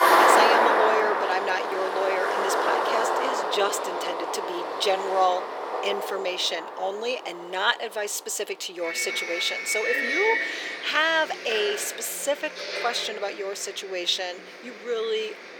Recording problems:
thin; very; fading below 400 Hz
traffic noise; very loud; throughout; 2 dB above the speech

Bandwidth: 18.5 kHz